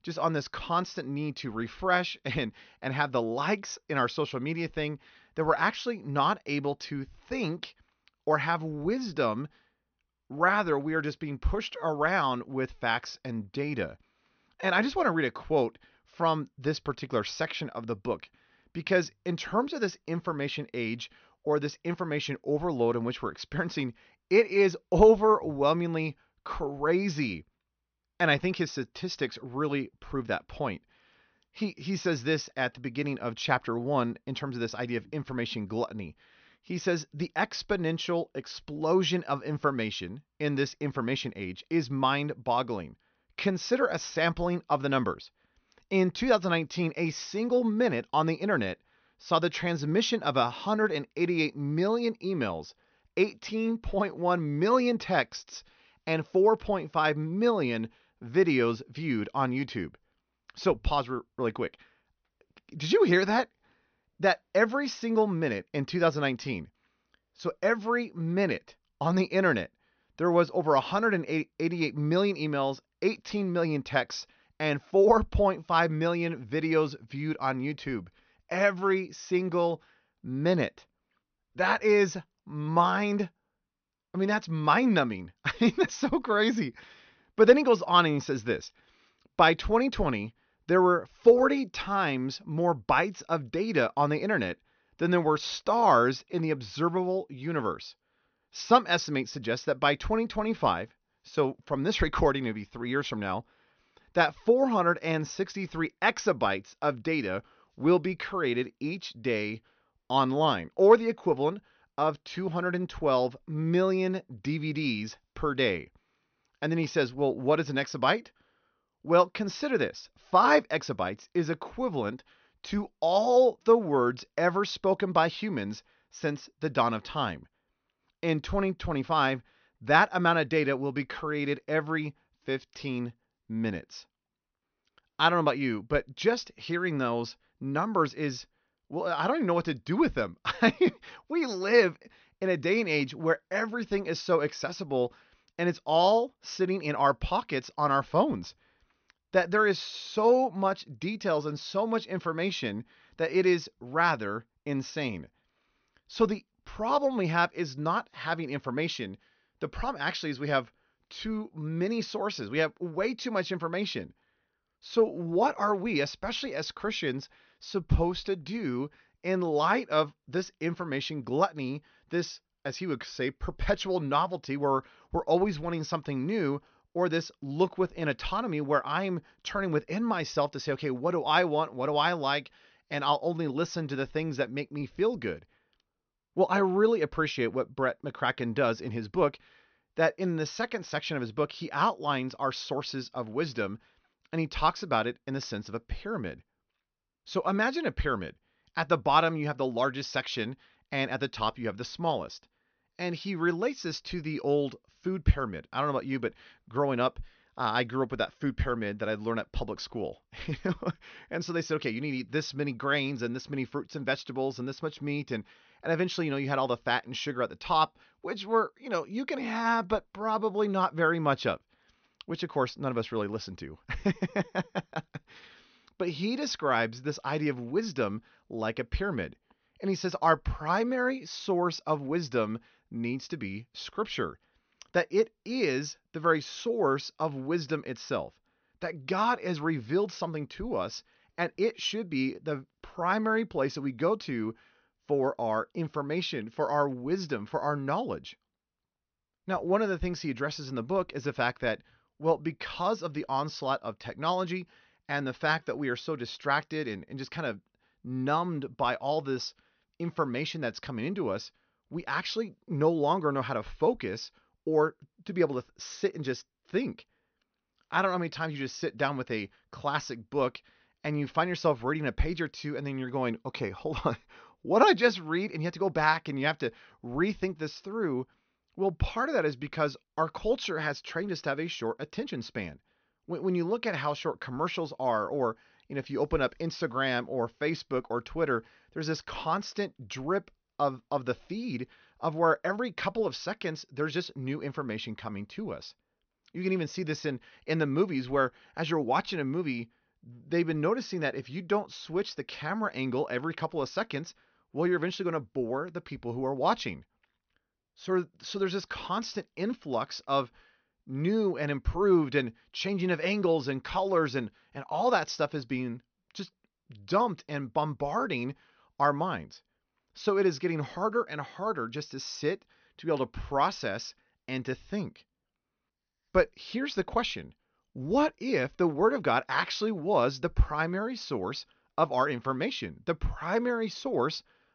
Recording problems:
high frequencies cut off; noticeable; nothing above 6 kHz

